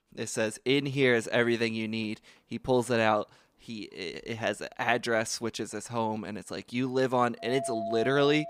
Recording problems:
household noises; loud; from 2 s on; 7 dB below the speech

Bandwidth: 15.5 kHz